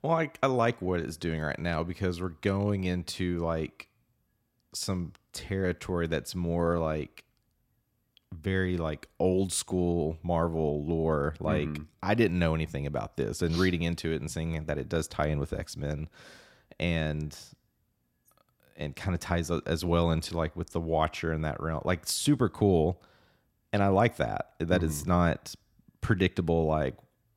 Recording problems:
none

